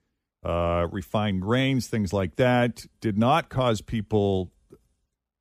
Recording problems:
none

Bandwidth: 15 kHz